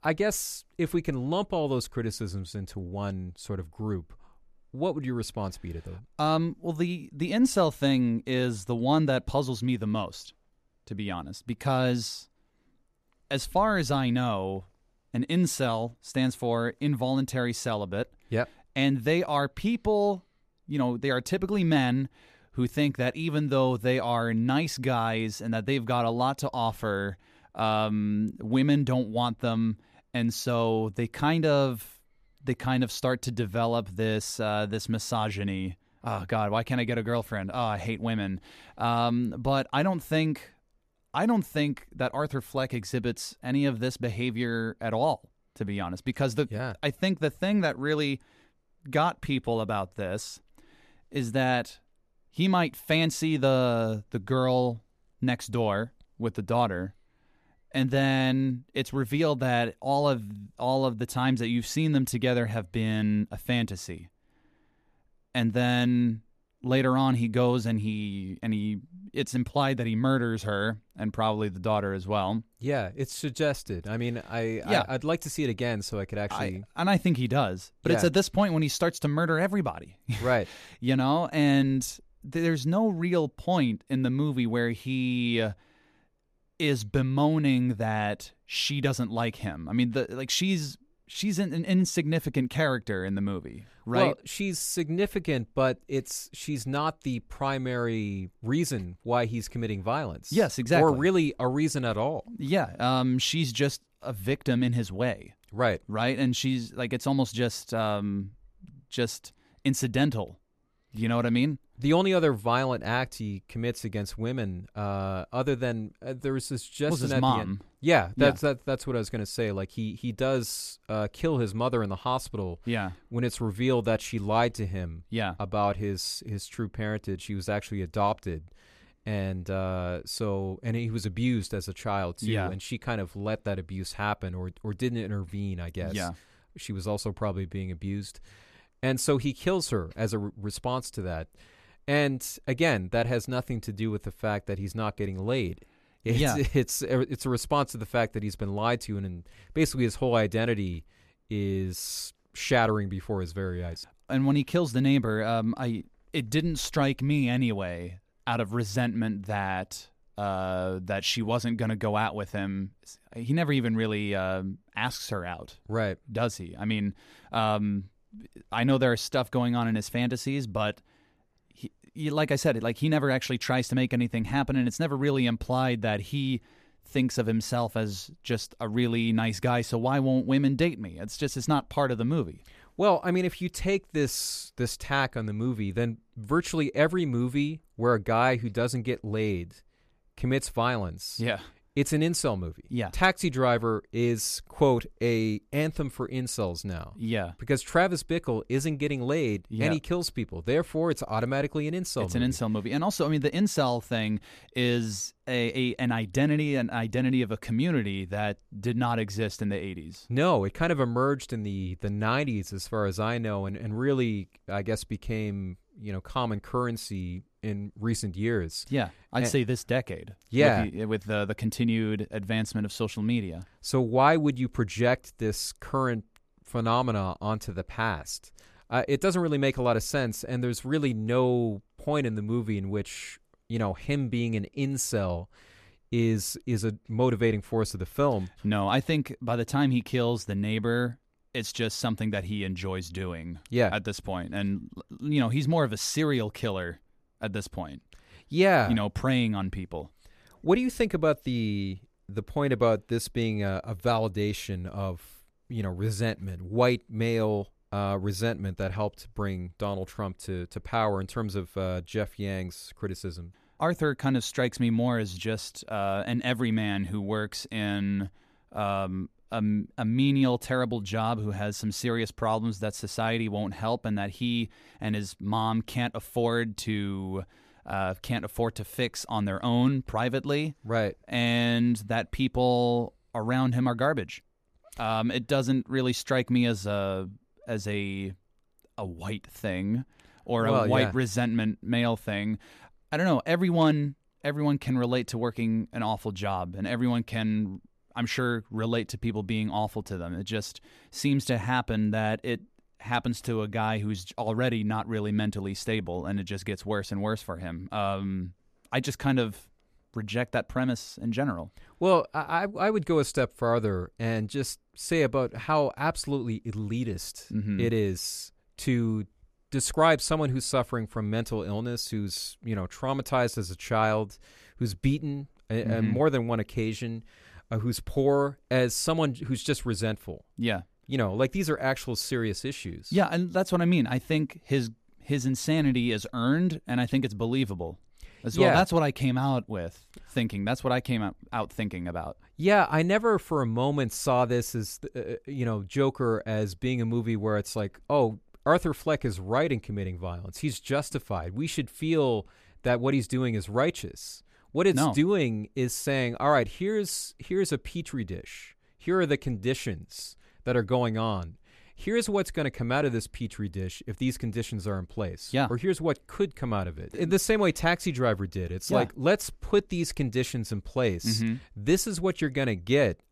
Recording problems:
none

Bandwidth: 14.5 kHz